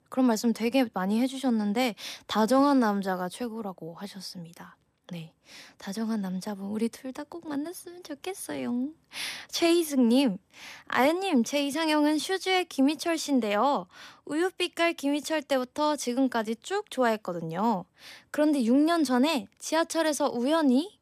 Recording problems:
none

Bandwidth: 14.5 kHz